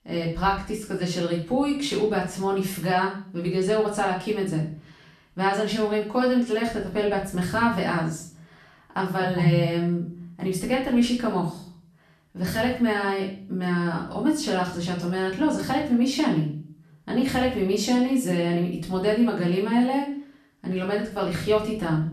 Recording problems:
off-mic speech; far
room echo; noticeable; dies away in 0.5 s

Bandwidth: 13.5 kHz